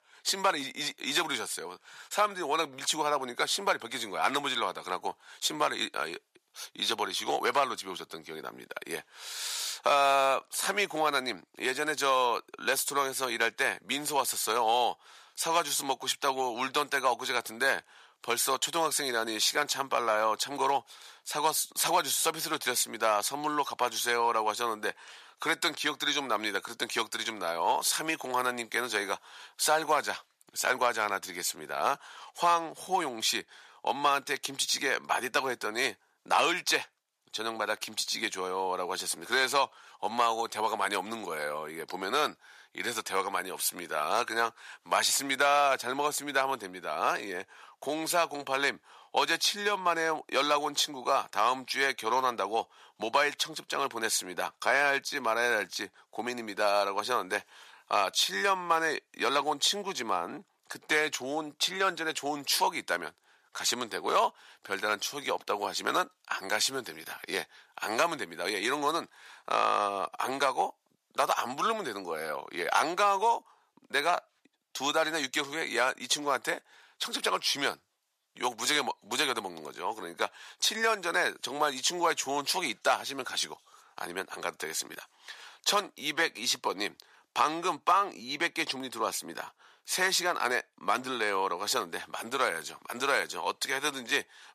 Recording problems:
thin; very; fading below 700 Hz

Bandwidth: 14.5 kHz